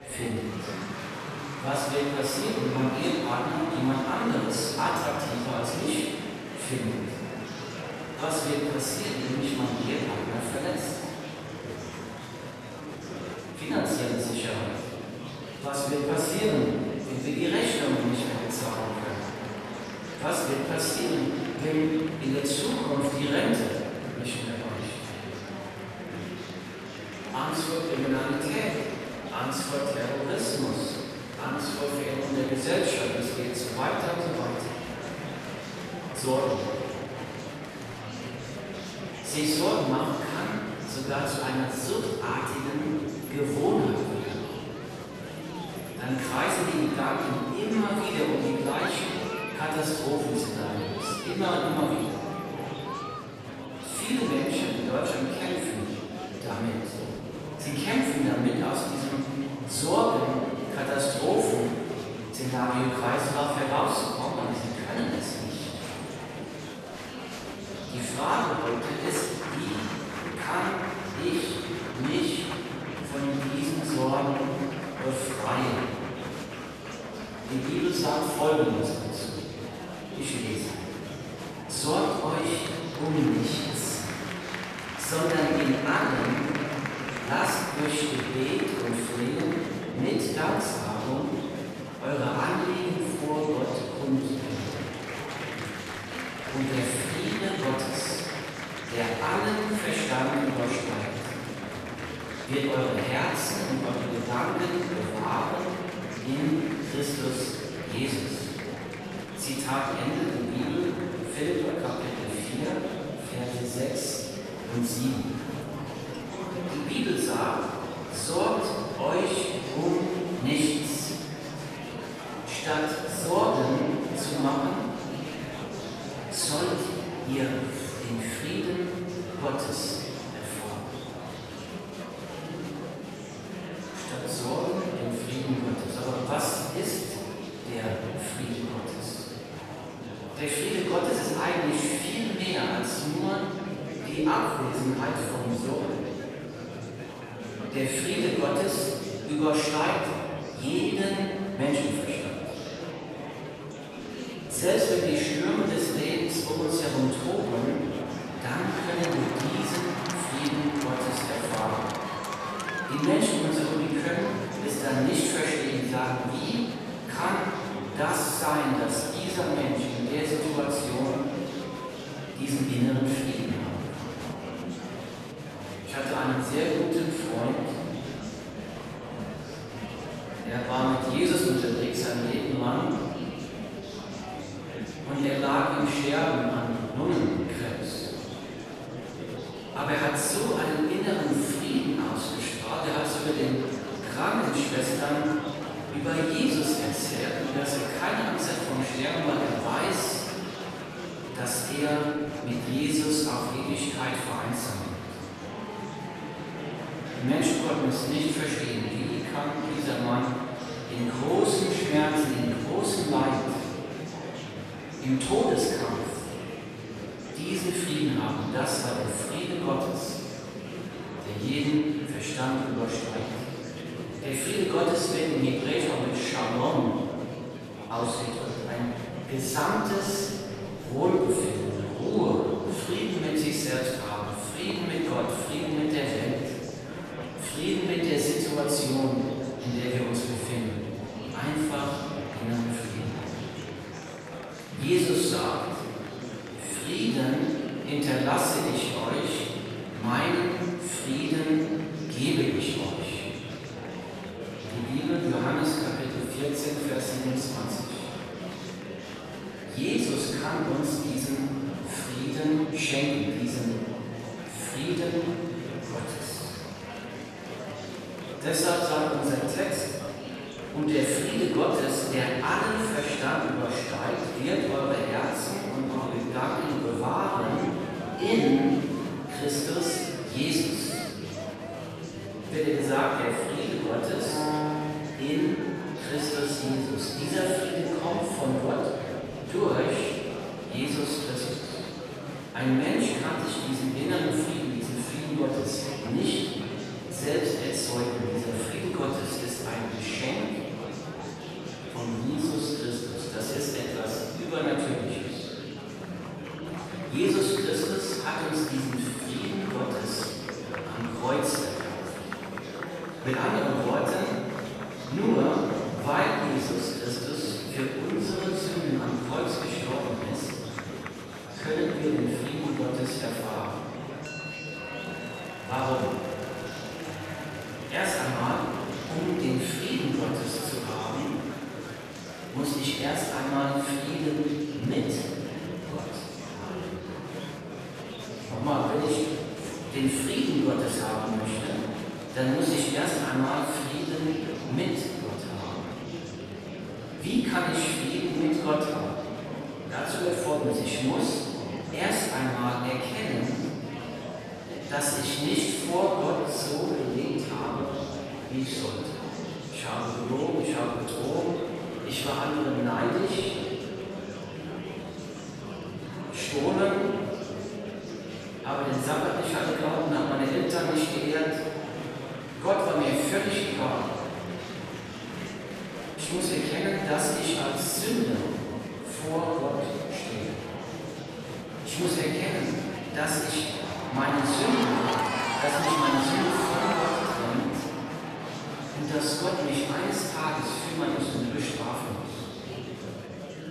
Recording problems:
room echo; strong; dies away in 1.9 s
off-mic speech; far
murmuring crowd; loud; throughout; 8 dB below the speech
background music; faint; throughout; 20 dB below the speech

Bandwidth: 13.5 kHz